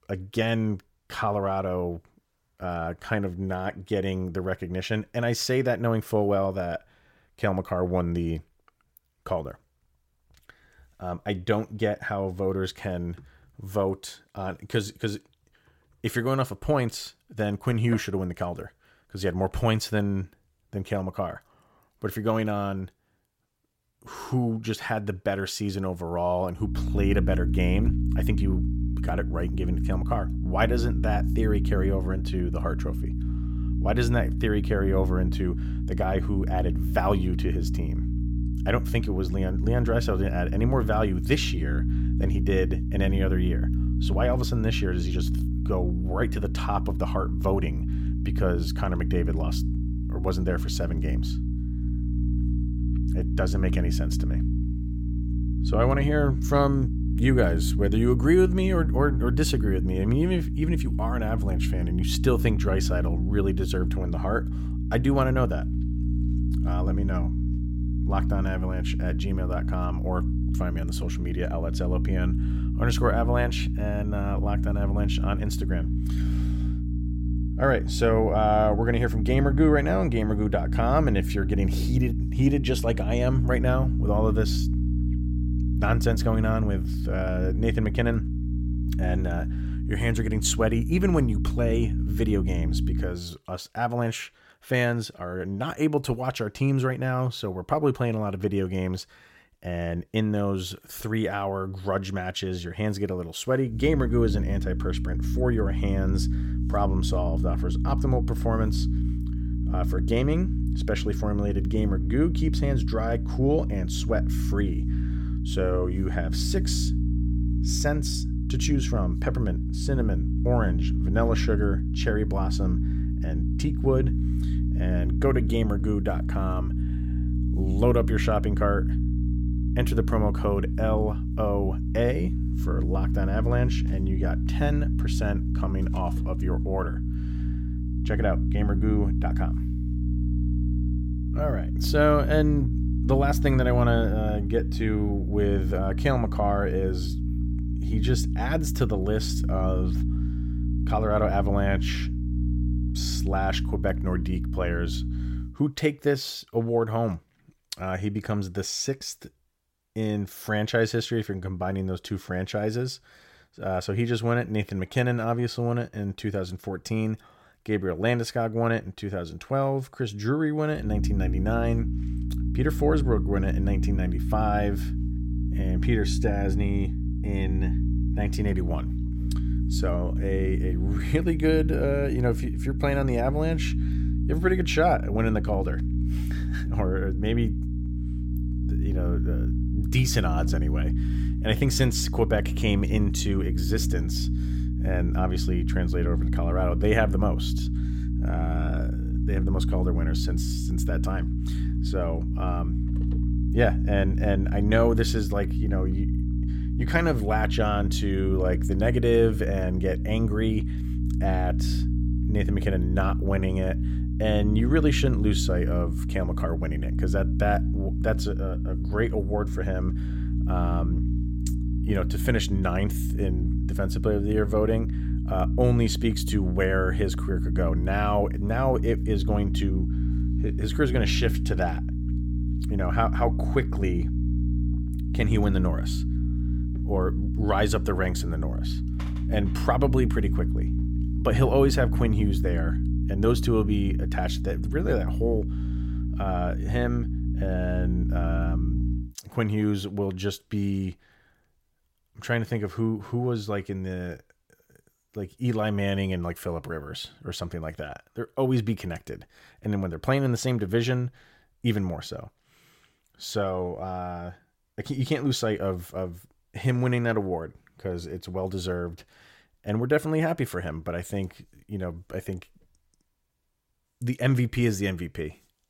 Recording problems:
electrical hum; loud; from 27 s to 1:33, from 1:44 to 2:35 and from 2:51 to 4:09; 60 Hz, 9 dB below the speech

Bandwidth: 16.5 kHz